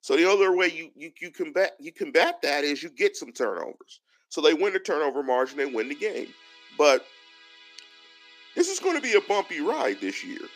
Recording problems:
thin; very slightly; fading below 250 Hz
background music; faint; from 5.5 s on; 20 dB below the speech

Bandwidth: 15 kHz